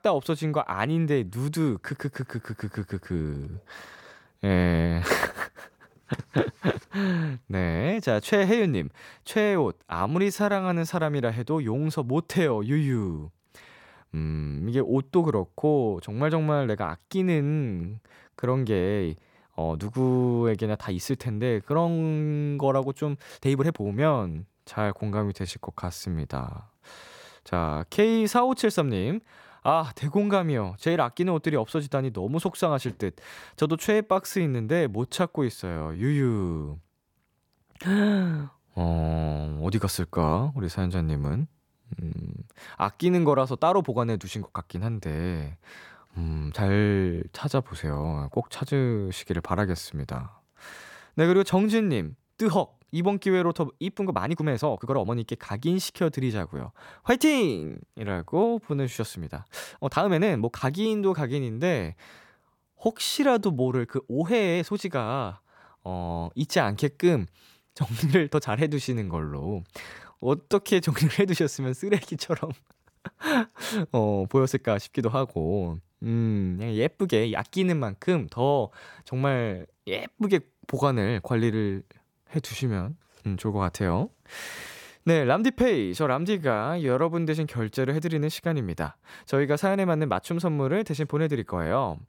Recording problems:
uneven, jittery; strongly; from 4.5 s to 1:27

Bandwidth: 18 kHz